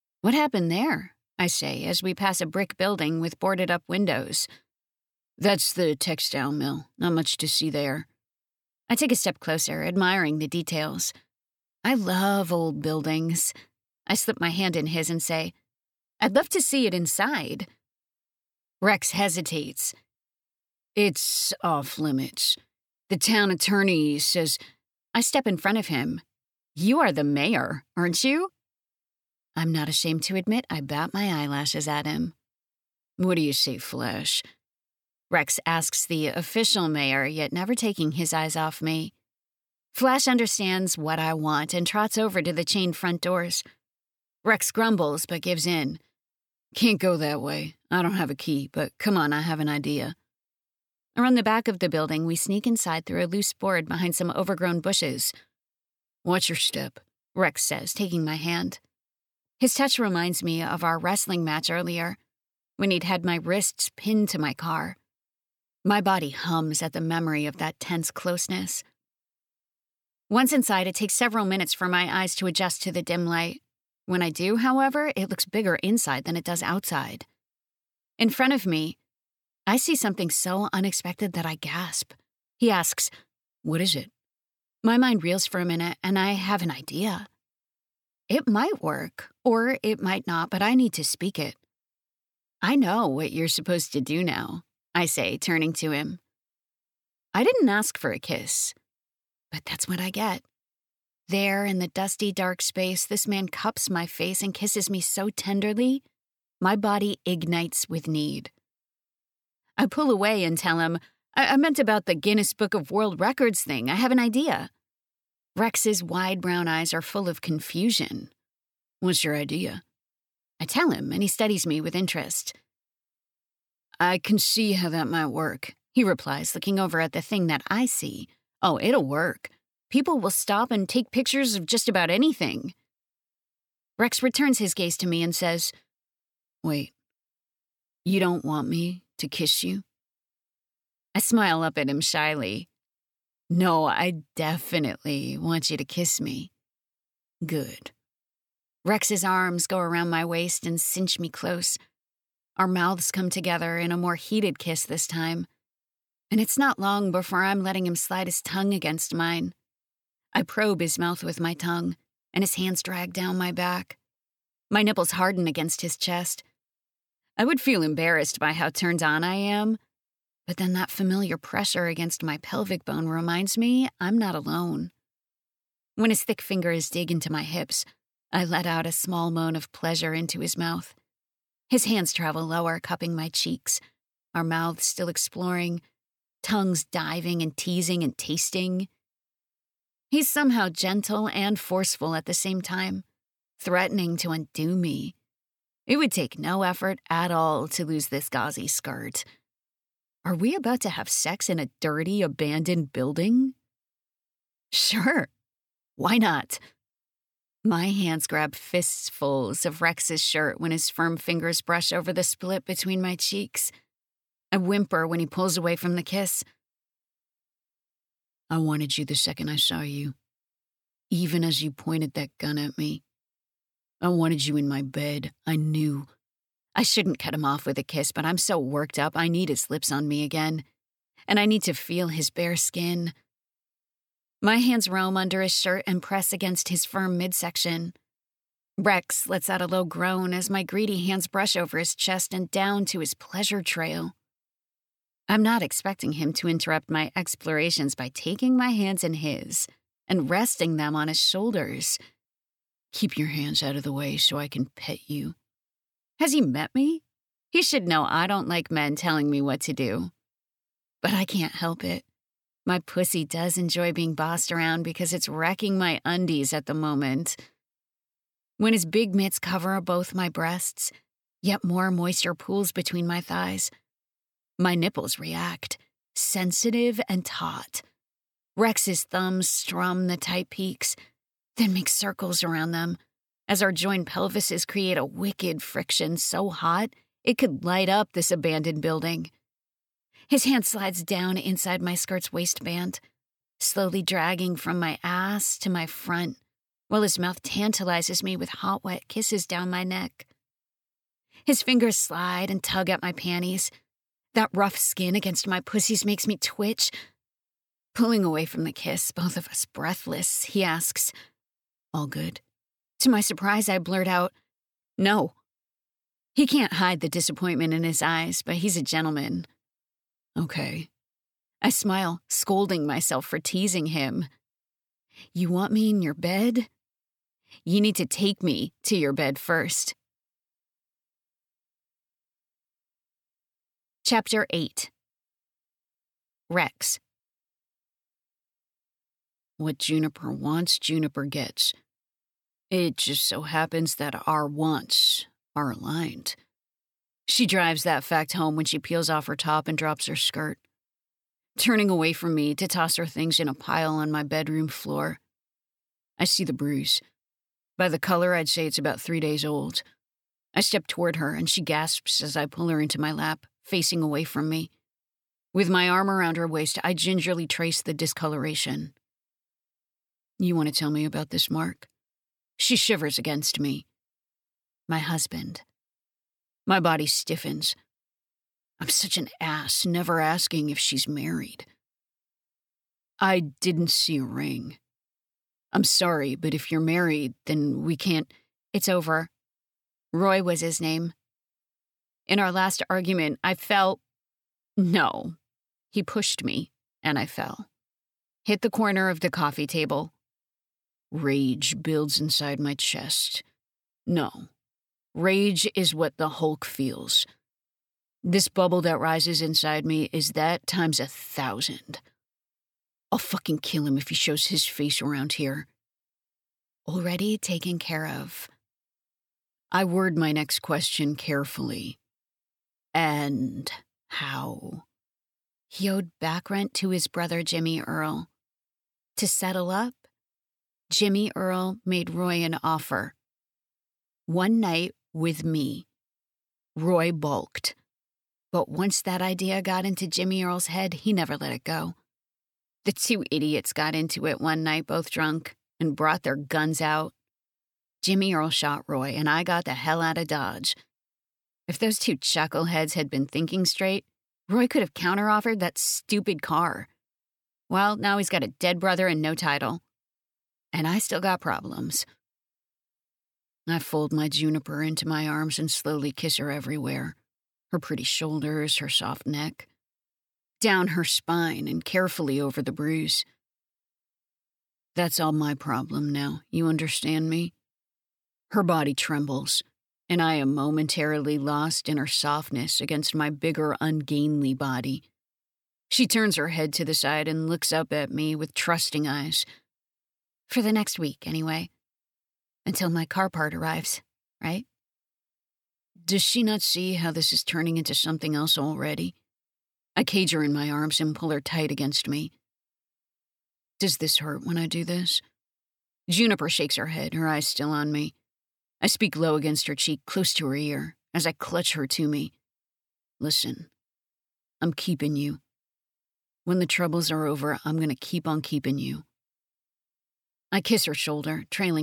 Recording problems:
abrupt cut into speech; at the end

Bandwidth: 18.5 kHz